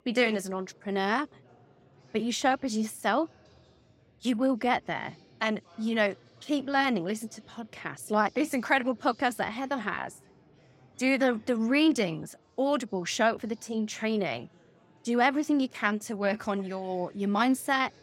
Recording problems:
chatter from many people; faint; throughout; 30 dB below the speech

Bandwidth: 16 kHz